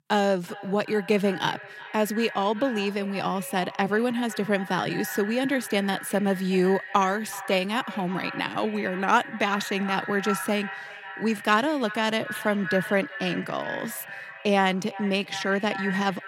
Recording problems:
echo of what is said; strong; throughout; 370 ms later, 10 dB below the speech

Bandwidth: 16 kHz